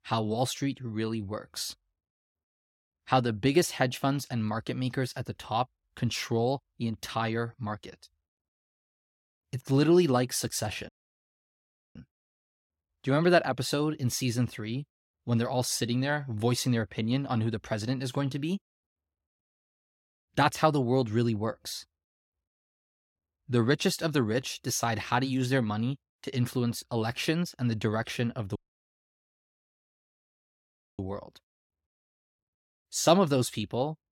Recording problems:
audio cutting out; at 11 s for 1 s and at 29 s for 2.5 s

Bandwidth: 16.5 kHz